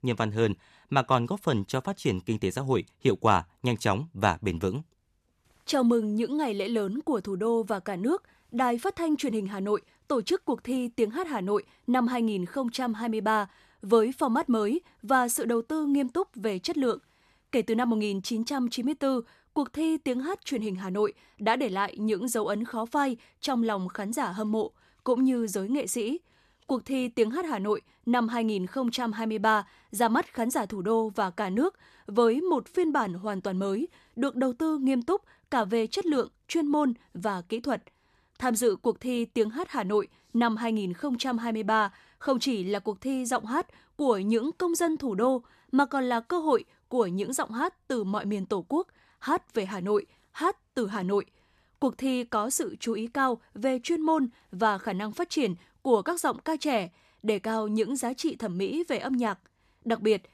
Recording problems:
none

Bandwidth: 13.5 kHz